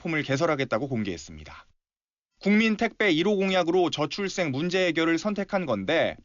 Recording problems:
high frequencies cut off; noticeable; nothing above 7 kHz

